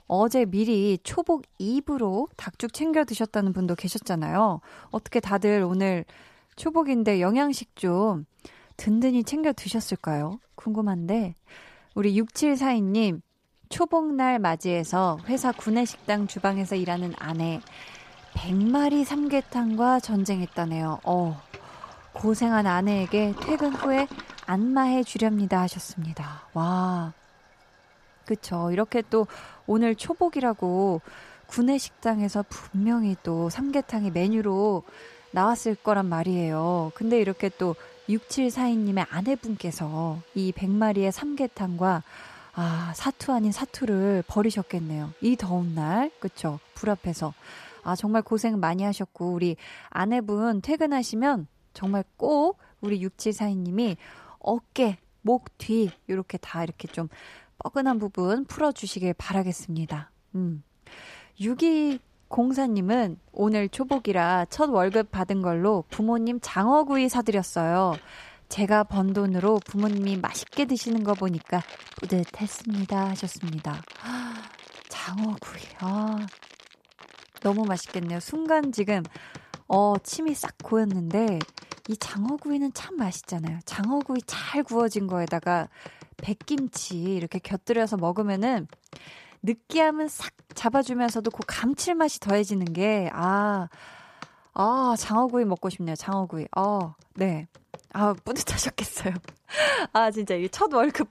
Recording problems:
household noises; faint; throughout; 20 dB below the speech

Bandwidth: 14.5 kHz